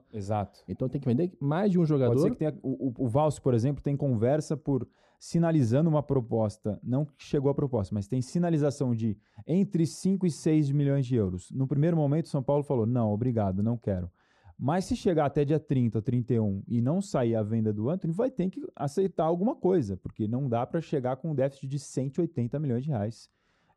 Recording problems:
muffled; very; fading above 1 kHz

